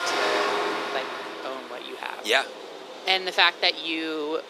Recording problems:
thin; very; fading below 400 Hz
traffic noise; loud; throughout; 3 dB below the speech
rain or running water; noticeable; throughout; 15 dB below the speech
background chatter; faint; throughout; 4 voices, 25 dB below the speech

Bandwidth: 14.5 kHz